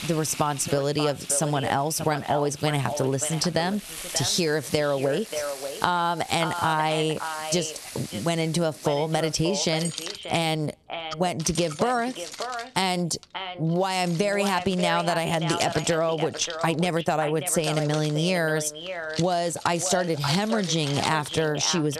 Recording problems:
echo of what is said; strong; throughout; 590 ms later, 10 dB below the speech
squashed, flat; somewhat, background pumping
household noises; noticeable; throughout; 15 dB below the speech

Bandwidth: 13.5 kHz